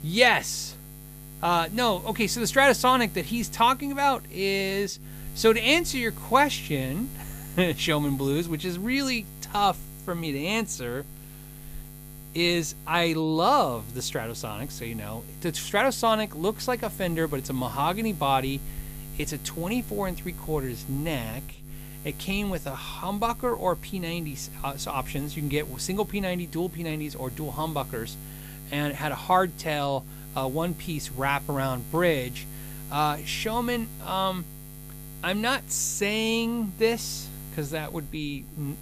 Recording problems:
electrical hum; faint; throughout; 60 Hz, 20 dB below the speech

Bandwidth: 15 kHz